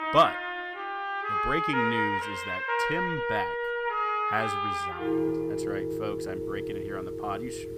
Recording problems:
background music; very loud; throughout; 3 dB above the speech

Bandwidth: 15.5 kHz